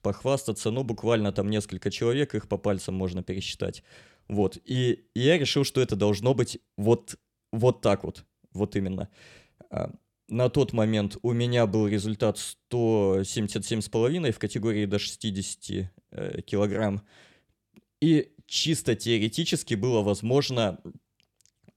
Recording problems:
none

